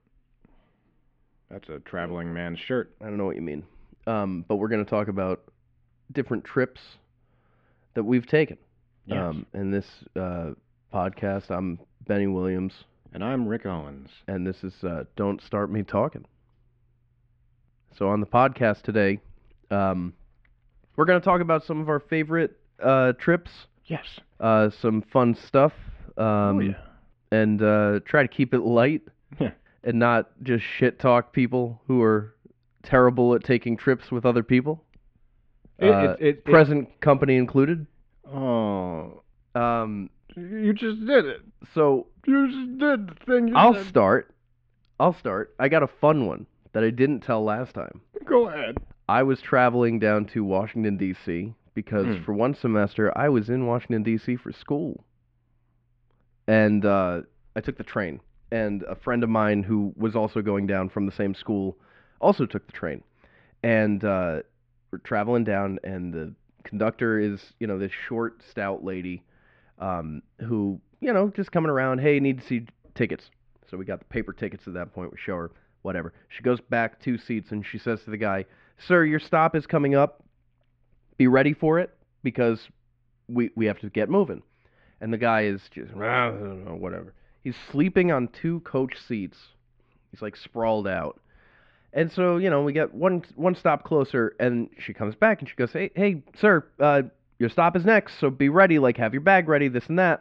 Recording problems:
muffled; very; fading above 2.5 kHz

